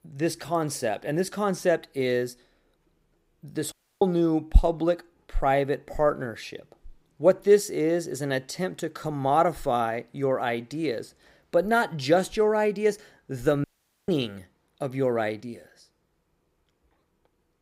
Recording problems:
audio cutting out; at 3.5 s and at 14 s

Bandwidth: 15.5 kHz